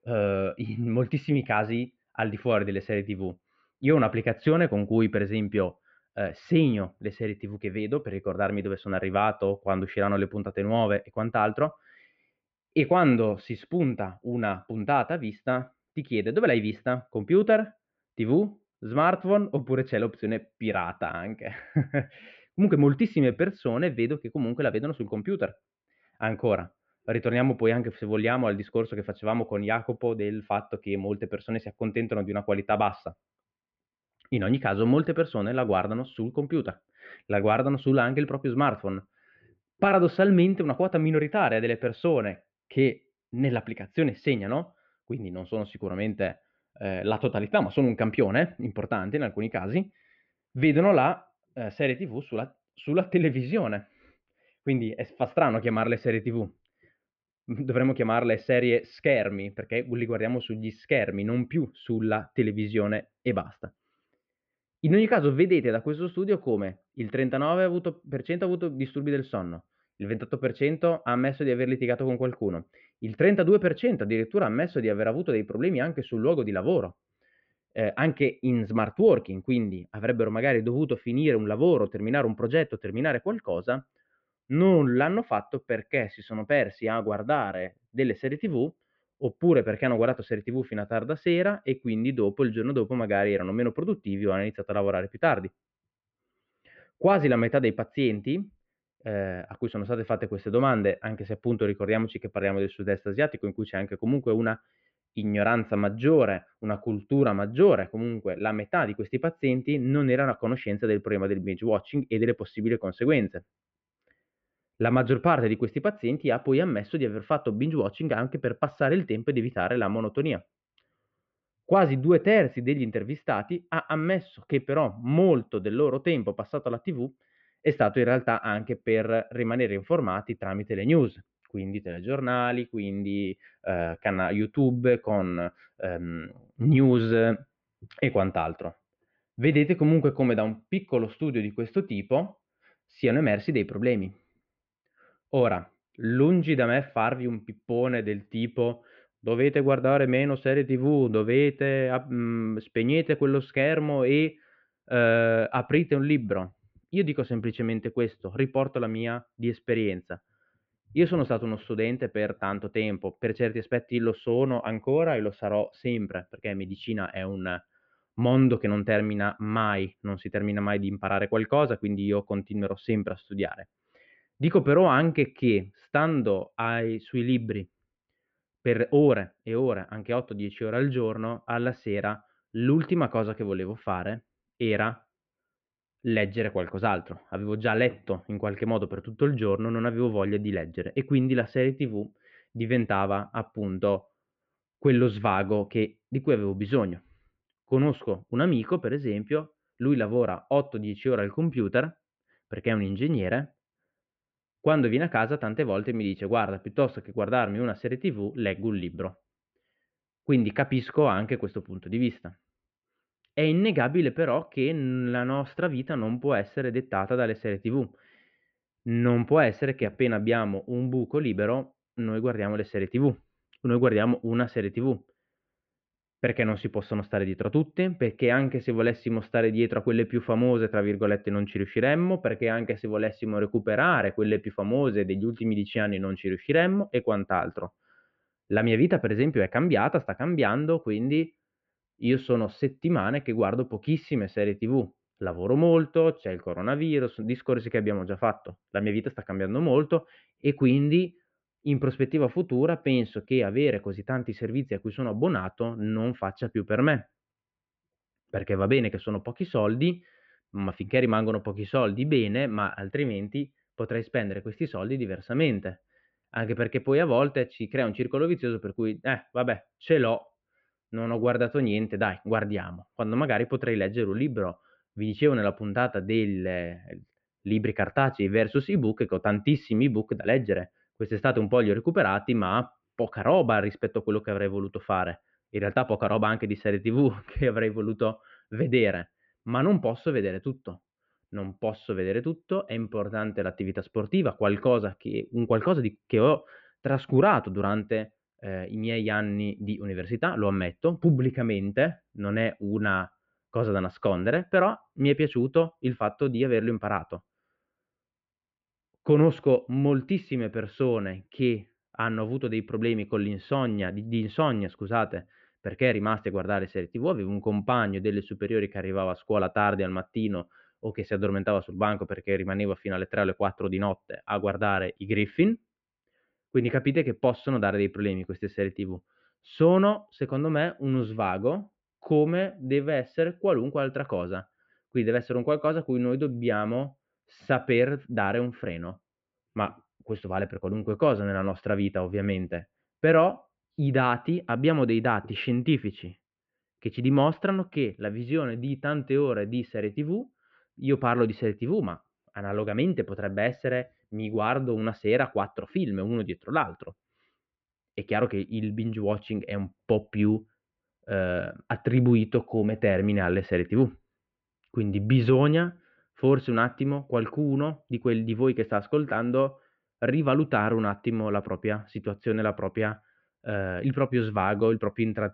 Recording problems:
muffled; very; fading above 2.5 kHz
high frequencies cut off; slight; nothing above 8 kHz

